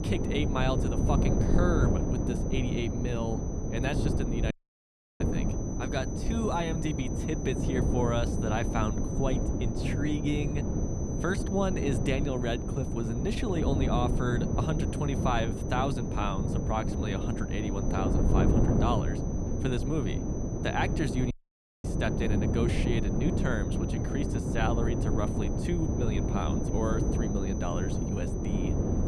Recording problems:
wind noise on the microphone; heavy; 3 dB below the speech
high-pitched whine; noticeable; throughout; 6 kHz, 15 dB below the speech
audio cutting out; at 4.5 s for 0.5 s and at 21 s for 0.5 s

